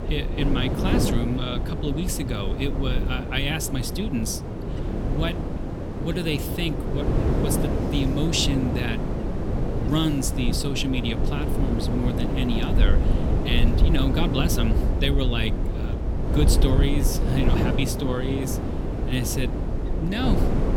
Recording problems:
wind noise on the microphone; heavy; 3 dB below the speech

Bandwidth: 17 kHz